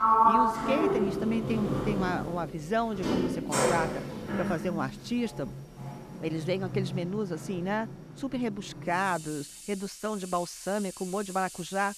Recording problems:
household noises; very loud; throughout; 1 dB above the speech

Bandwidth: 14.5 kHz